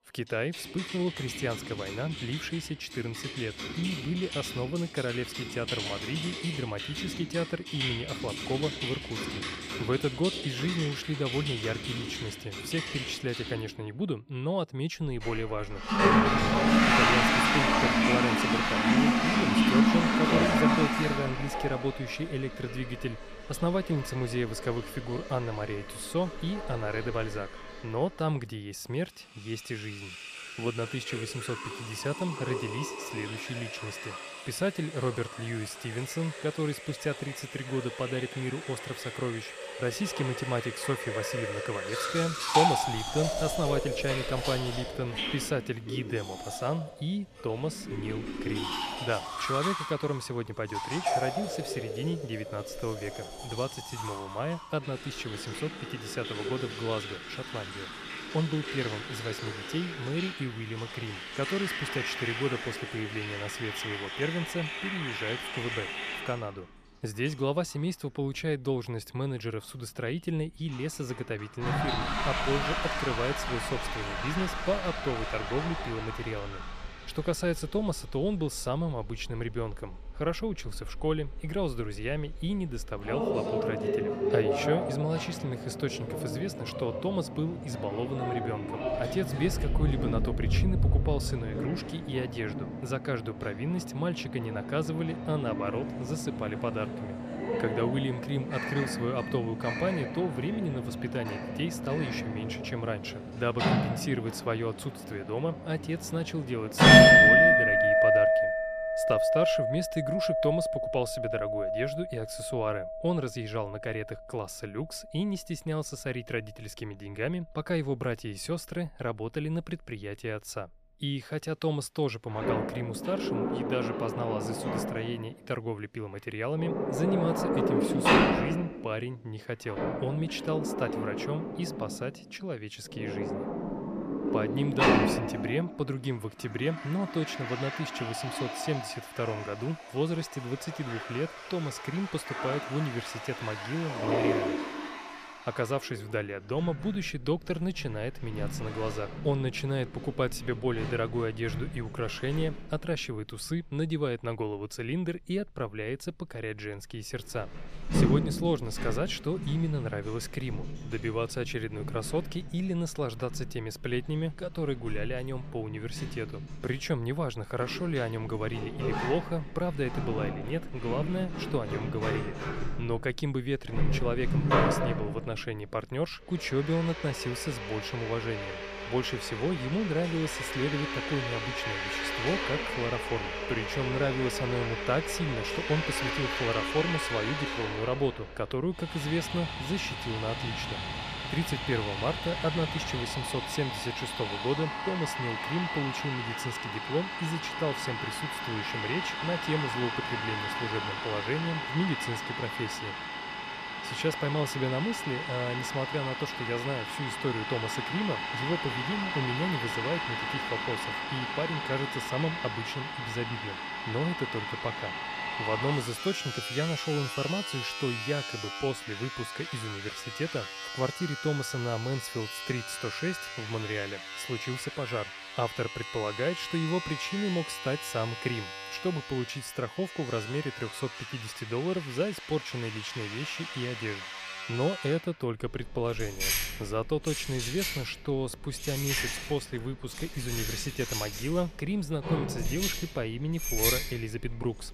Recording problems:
household noises; very loud; throughout; 2 dB above the speech

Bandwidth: 14.5 kHz